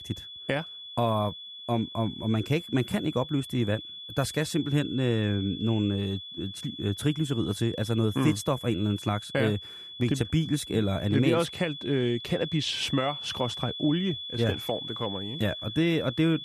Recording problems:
high-pitched whine; loud; throughout; 3.5 kHz, 9 dB below the speech

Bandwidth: 14.5 kHz